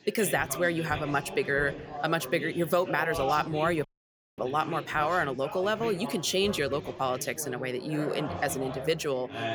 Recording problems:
chatter from many people; loud; throughout; 10 dB below the speech
audio cutting out; at 4 s for 0.5 s

